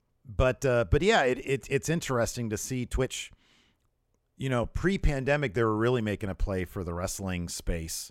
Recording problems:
uneven, jittery; slightly; from 0.5 to 5 s

